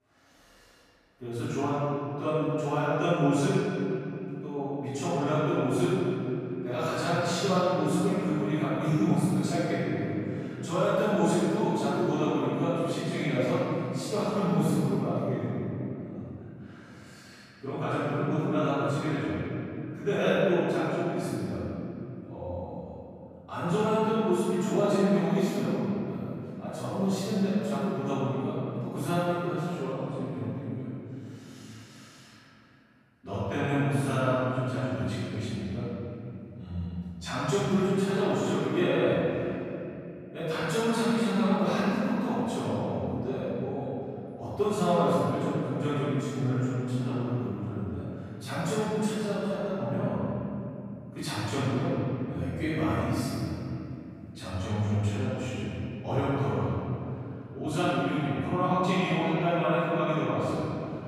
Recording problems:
room echo; strong; dies away in 3 s
off-mic speech; far

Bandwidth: 14.5 kHz